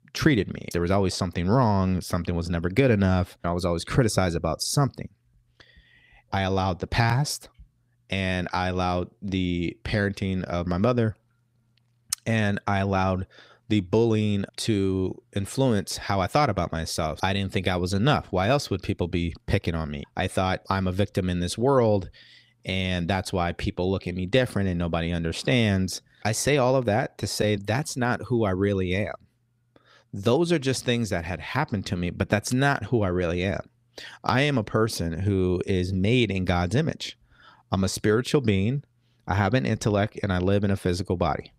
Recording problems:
none

